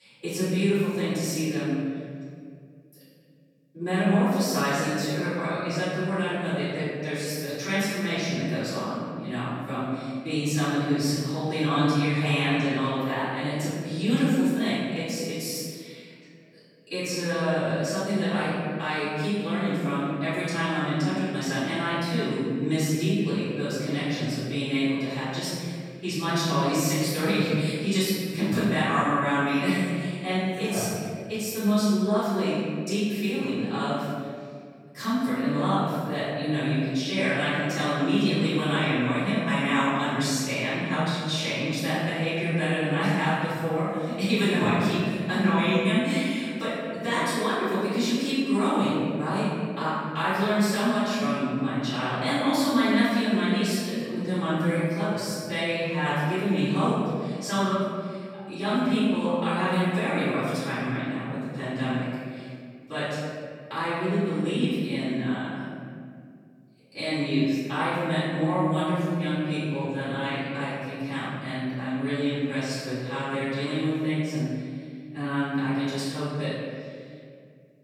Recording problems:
room echo; strong; dies away in 2 s
off-mic speech; far

